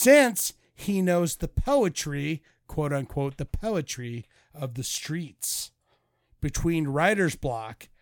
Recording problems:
abrupt cut into speech; at the start

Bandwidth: 18 kHz